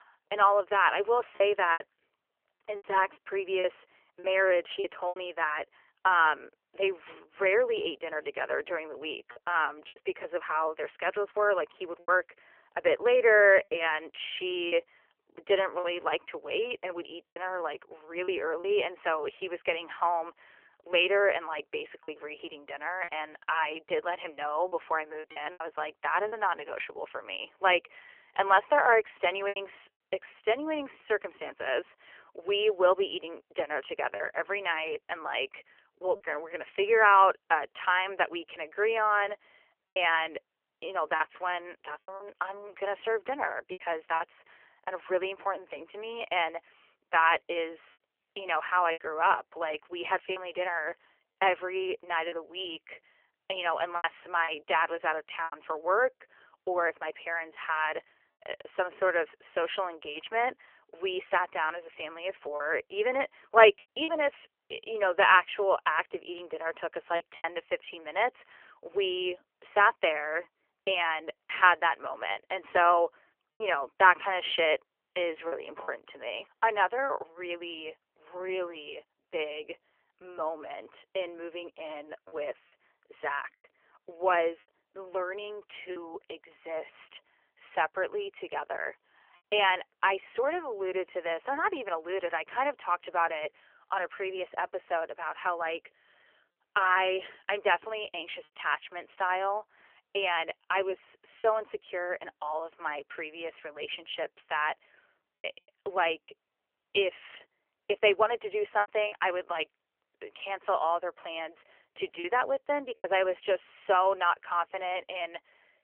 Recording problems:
phone-call audio; nothing above 3 kHz
choppy; occasionally; 4% of the speech affected

